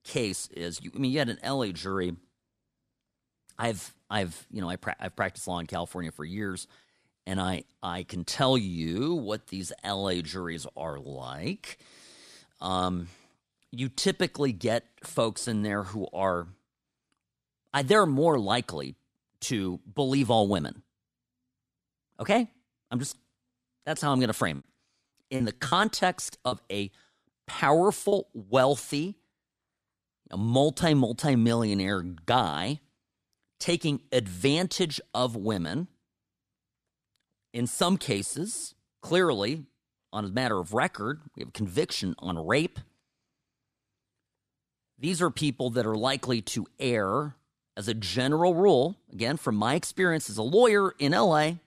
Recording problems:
choppy; very; from 25 to 28 s; 9% of the speech affected

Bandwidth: 14.5 kHz